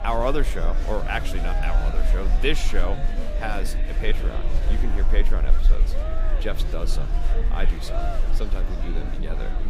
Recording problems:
murmuring crowd; loud; throughout; 5 dB below the speech
animal sounds; faint; from 6.5 s on; 25 dB below the speech
low rumble; faint; throughout; 20 dB below the speech

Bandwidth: 15.5 kHz